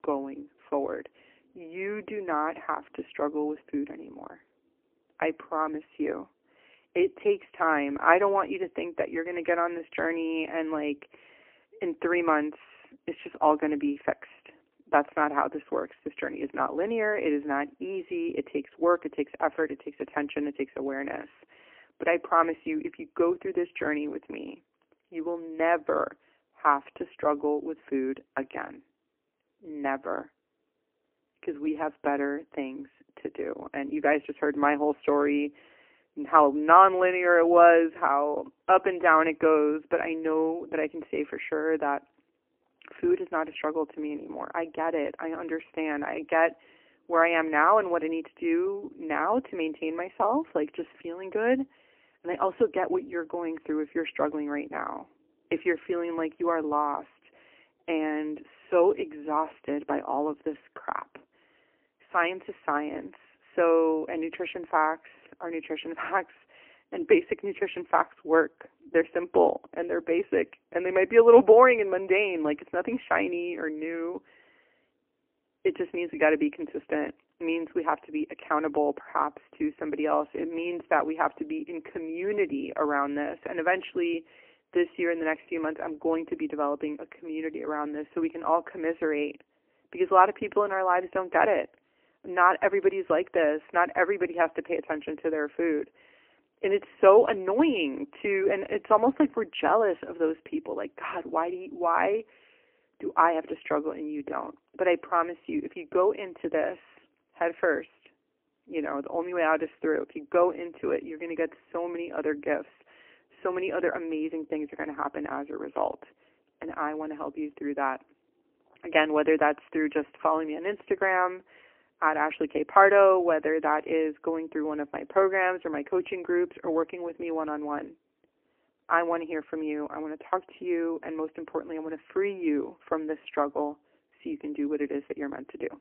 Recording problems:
phone-call audio; poor line; nothing above 3 kHz

